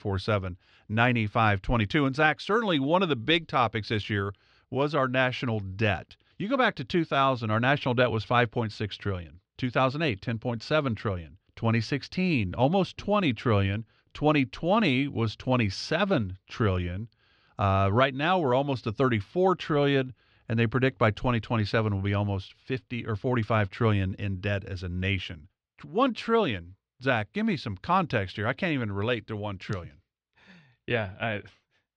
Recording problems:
muffled; very slightly; fading above 4 kHz

